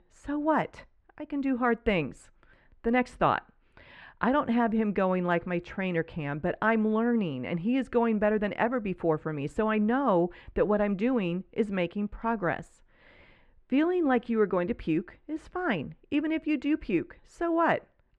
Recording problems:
muffled; very; fading above 2 kHz

